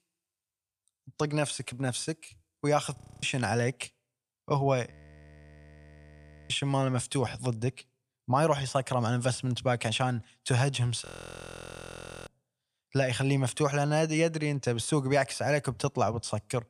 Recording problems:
audio freezing; at 3 s, at 5 s for 1.5 s and at 11 s for 1 s

